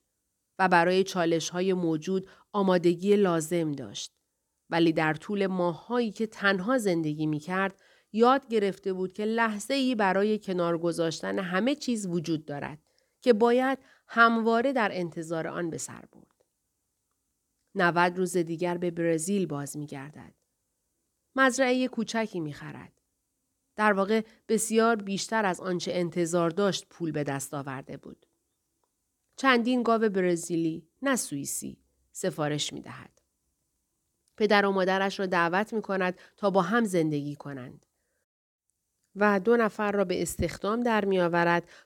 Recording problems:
none

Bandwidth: 18.5 kHz